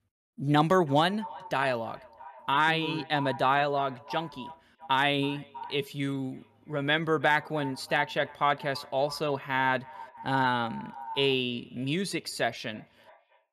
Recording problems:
echo of what is said; noticeable; throughout; 320 ms later, 15 dB below the speech

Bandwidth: 13.5 kHz